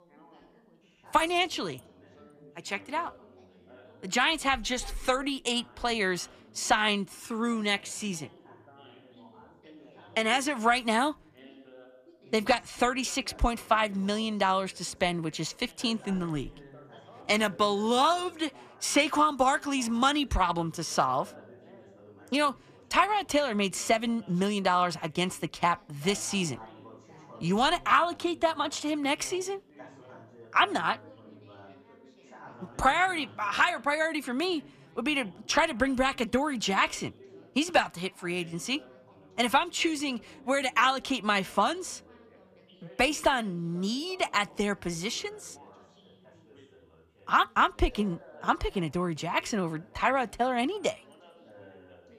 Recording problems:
background chatter; faint; throughout; 3 voices, 25 dB below the speech

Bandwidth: 14.5 kHz